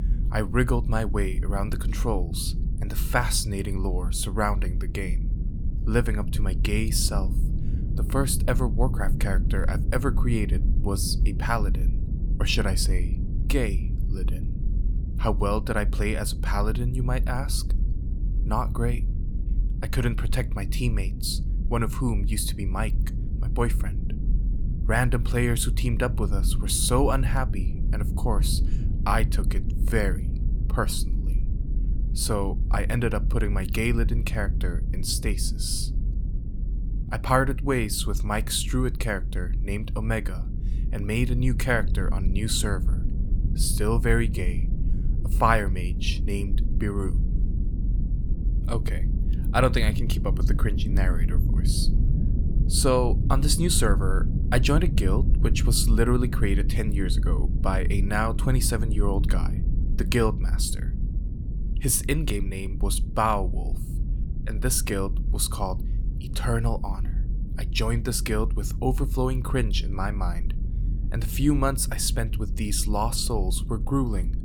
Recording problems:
low rumble; noticeable; throughout; 15 dB below the speech

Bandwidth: 18.5 kHz